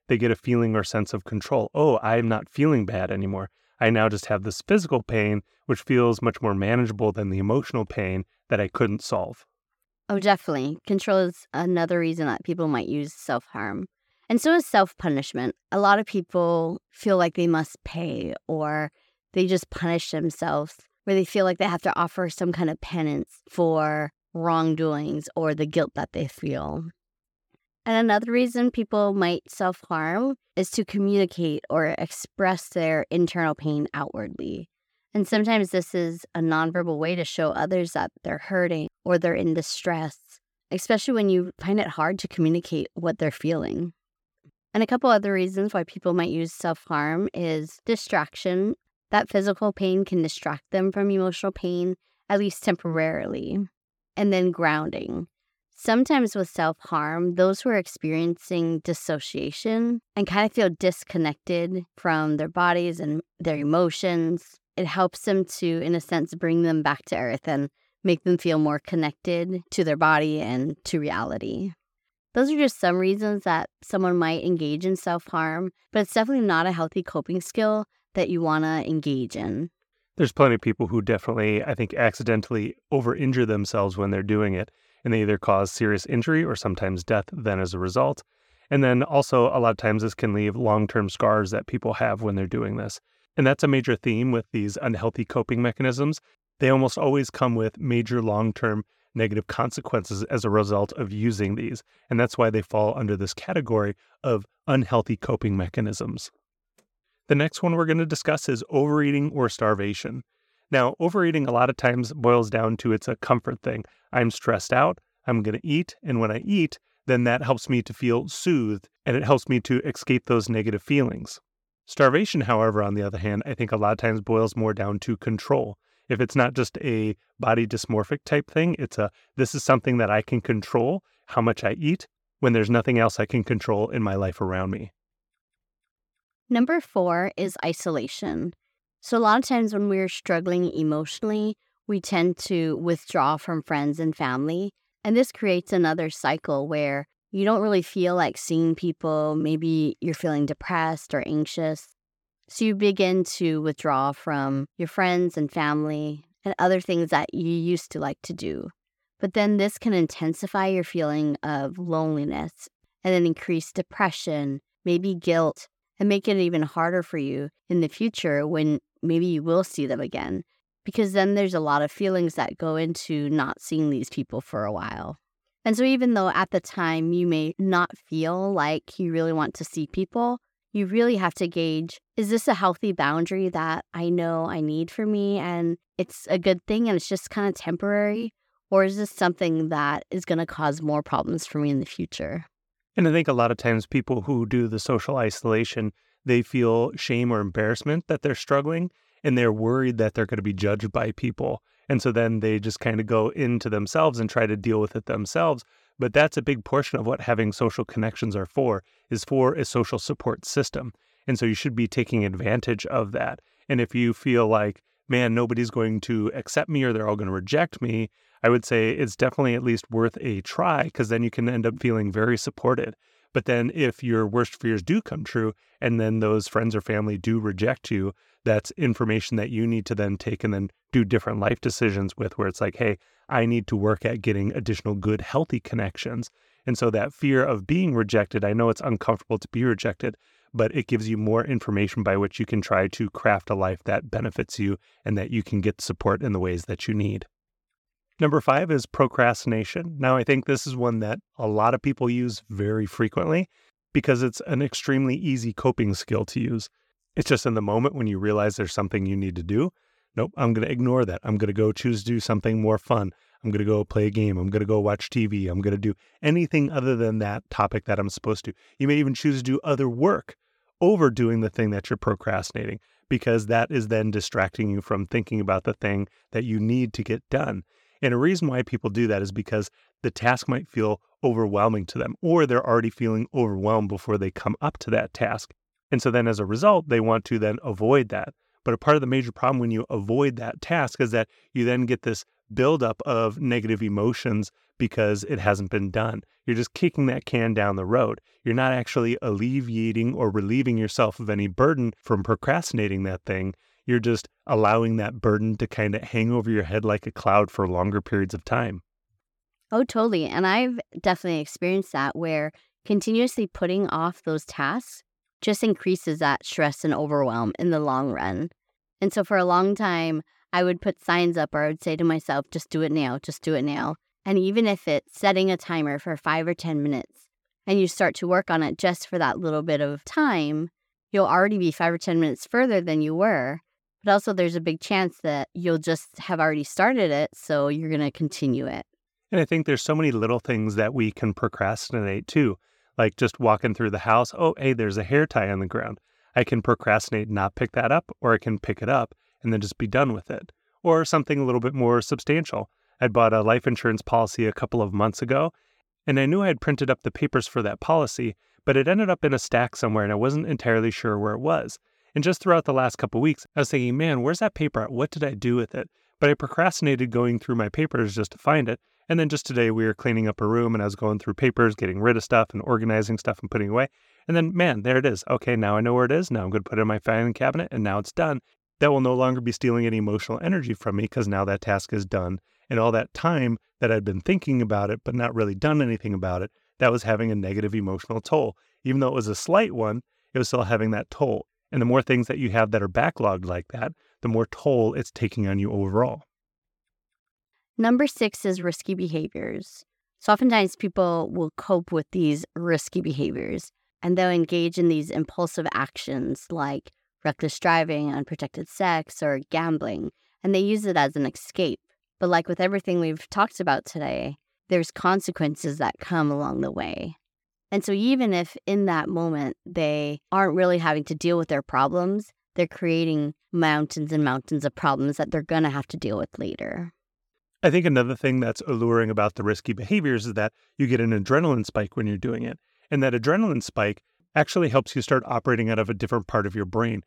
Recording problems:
none

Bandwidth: 17.5 kHz